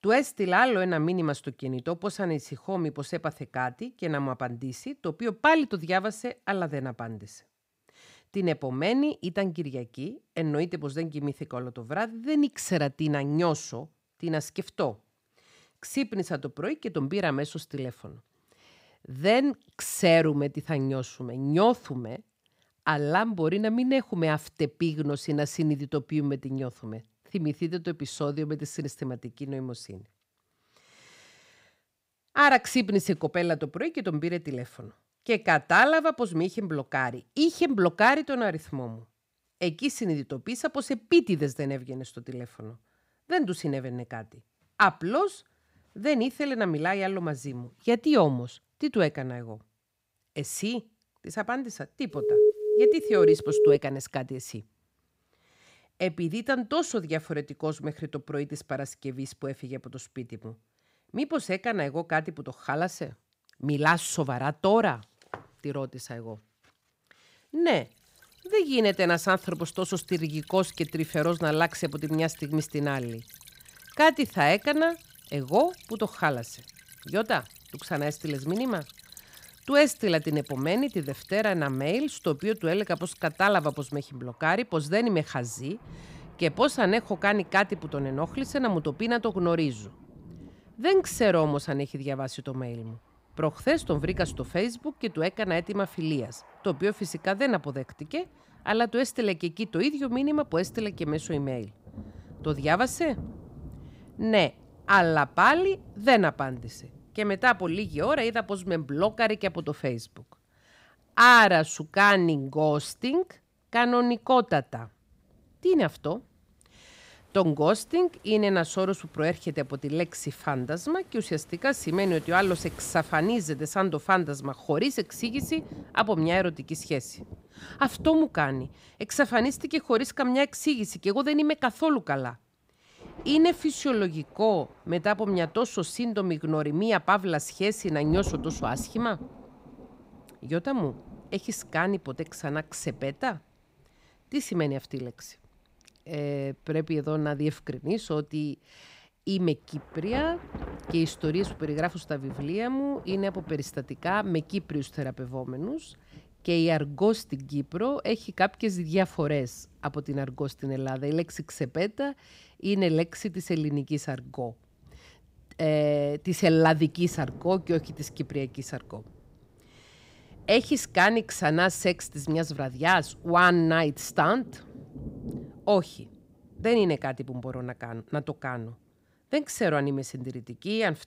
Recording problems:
rain or running water; noticeable; from 1:08 on; 20 dB below the speech
alarm; loud; from 52 to 54 s; peak 6 dB above the speech

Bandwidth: 15.5 kHz